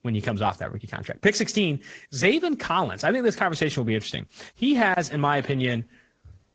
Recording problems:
garbled, watery; slightly

